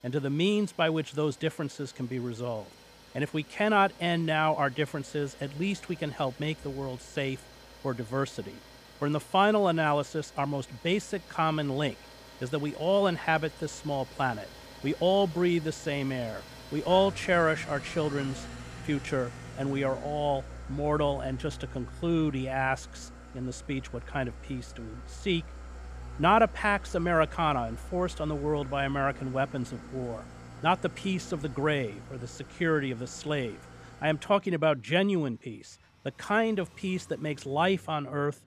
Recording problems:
traffic noise; noticeable; throughout; 15 dB below the speech

